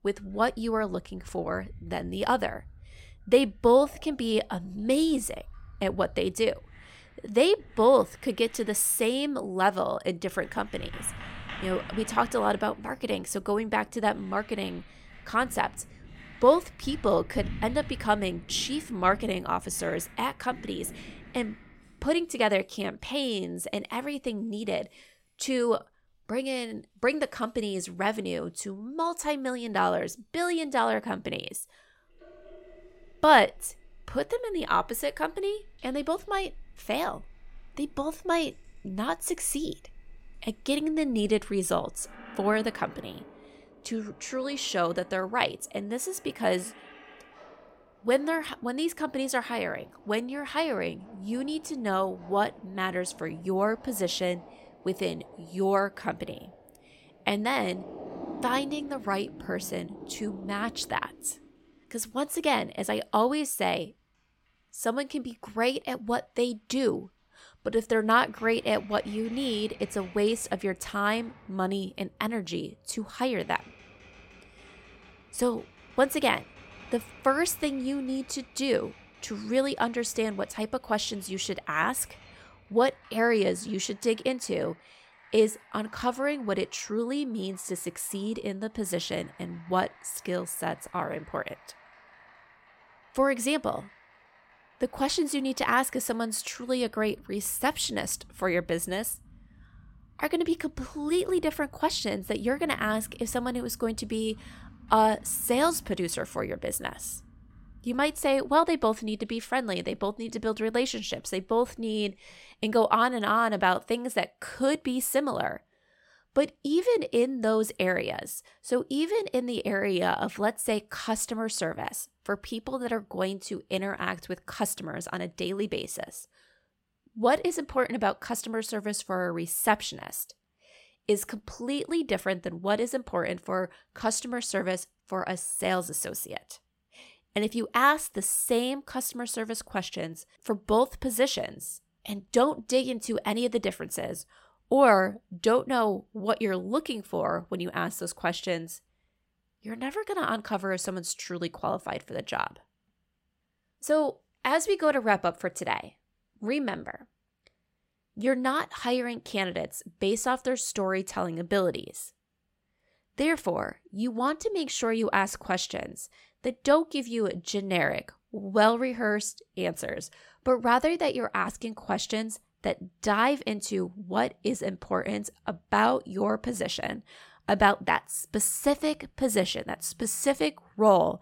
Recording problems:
household noises; faint; until 1:52; 20 dB below the speech

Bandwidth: 16.5 kHz